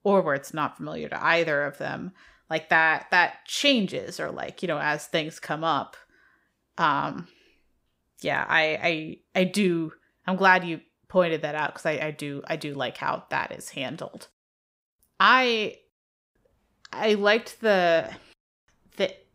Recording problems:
none

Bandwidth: 15.5 kHz